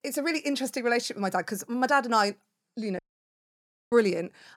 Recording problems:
audio cutting out; at 3 s for 1 s

